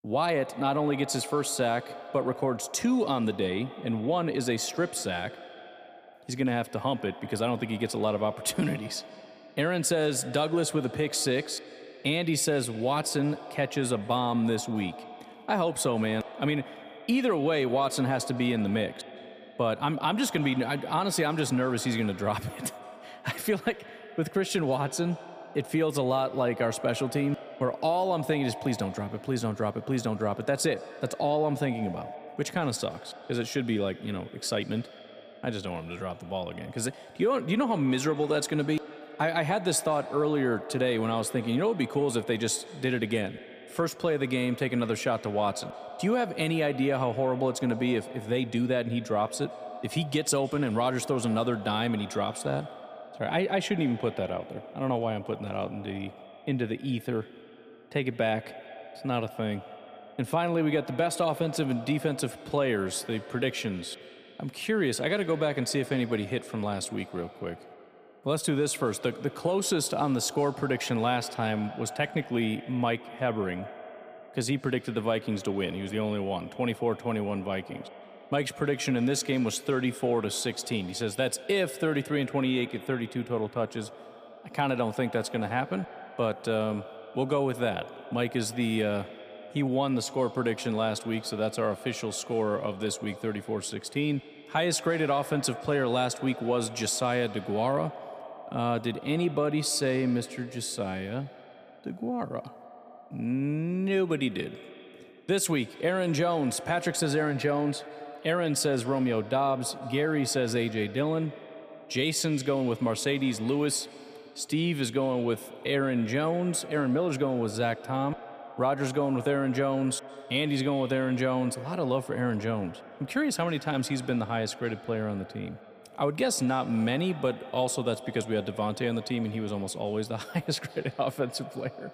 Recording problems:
echo of what is said; noticeable; throughout; 170 ms later, 15 dB below the speech

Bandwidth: 15 kHz